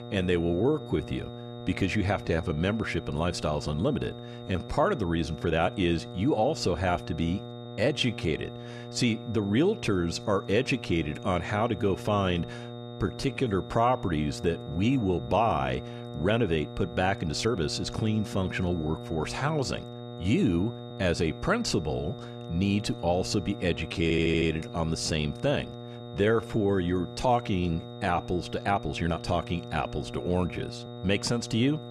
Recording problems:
electrical hum; noticeable; throughout; 60 Hz, 15 dB below the speech
high-pitched whine; faint; throughout; 3.5 kHz, 25 dB below the speech
uneven, jittery; strongly; from 0.5 to 31 s
audio stuttering; at 24 s

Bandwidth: 13.5 kHz